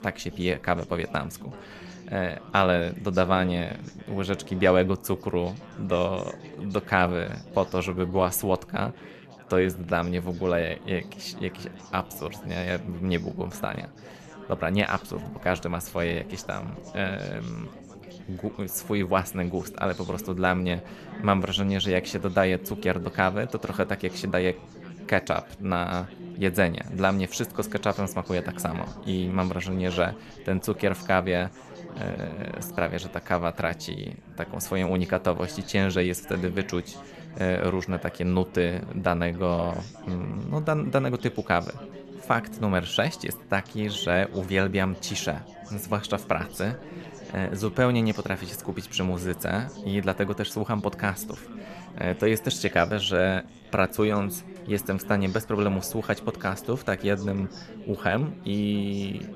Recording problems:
background chatter; noticeable; throughout; 4 voices, 15 dB below the speech

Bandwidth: 13.5 kHz